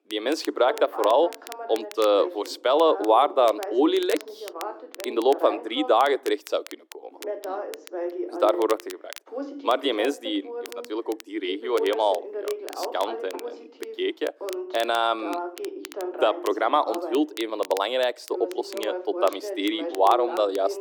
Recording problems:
muffled; slightly; fading above 1.5 kHz
thin; somewhat; fading below 300 Hz
voice in the background; noticeable; throughout; 10 dB below the speech
crackle, like an old record; noticeable; 20 dB below the speech

